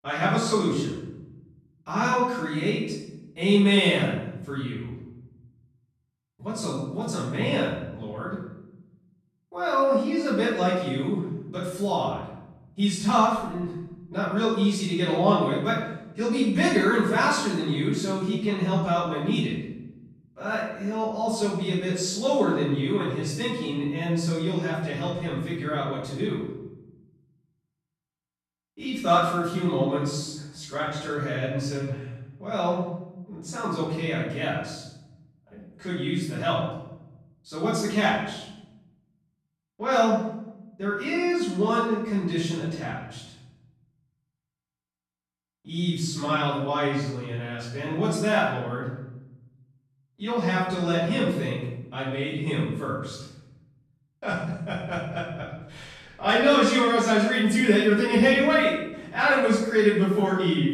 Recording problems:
off-mic speech; far
room echo; noticeable; dies away in 0.9 s

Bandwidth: 14 kHz